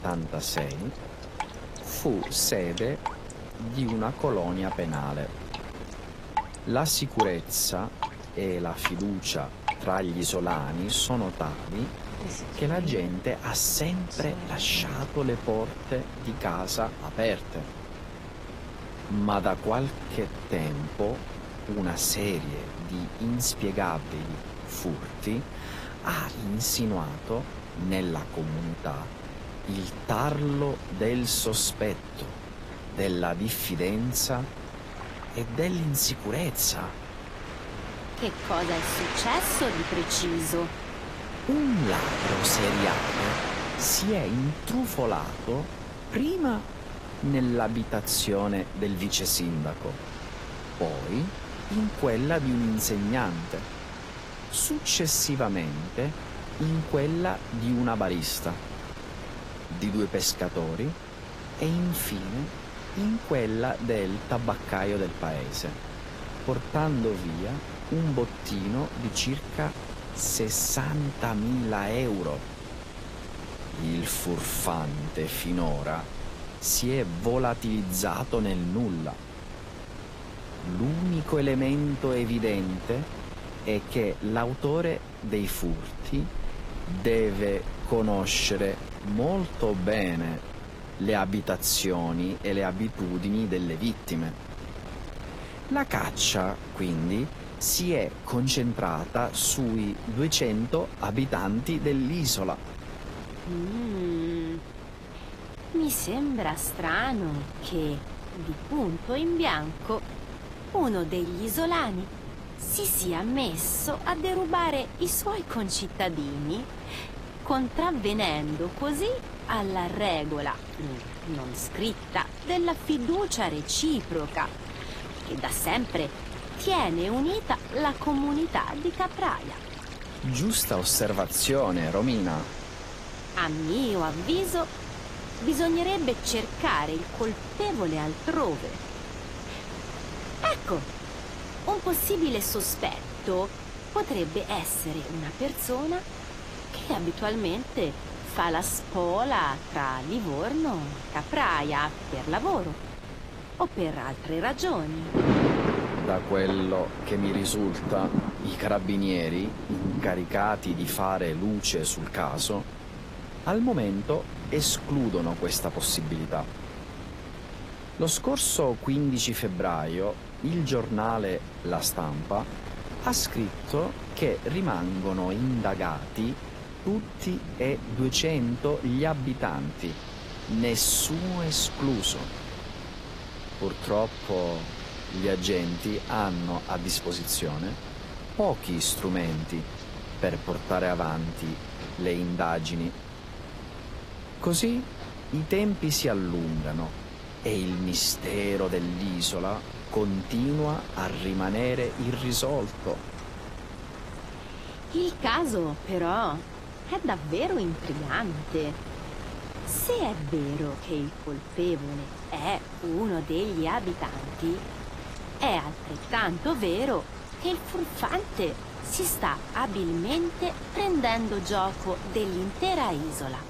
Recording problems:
garbled, watery; slightly; nothing above 12.5 kHz
rain or running water; noticeable; throughout; 10 dB below the speech
wind noise on the microphone; occasional gusts; 15 dB below the speech

